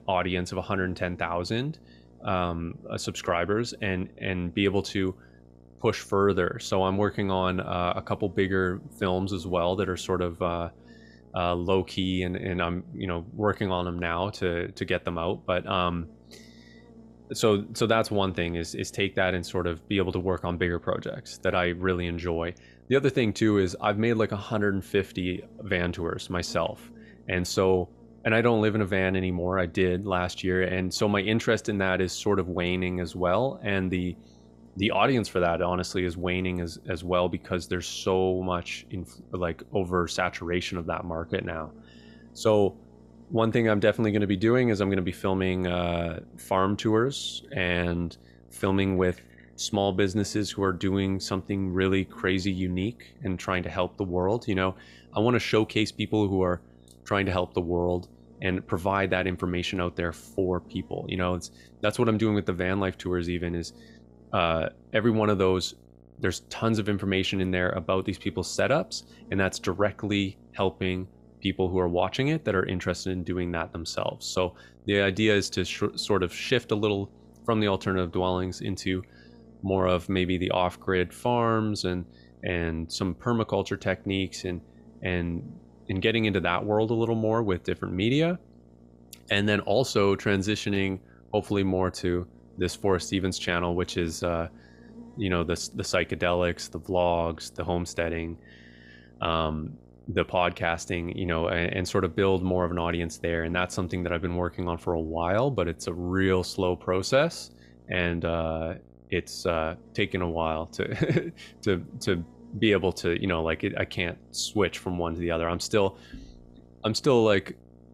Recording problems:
electrical hum; faint; throughout; 60 Hz, 30 dB below the speech

